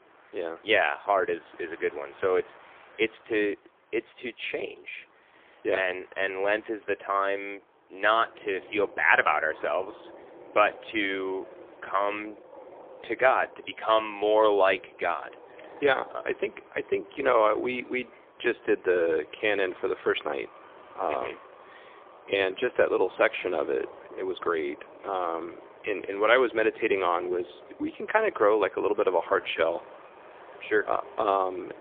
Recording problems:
phone-call audio; poor line; nothing above 3.5 kHz
train or aircraft noise; faint; throughout; 20 dB below the speech

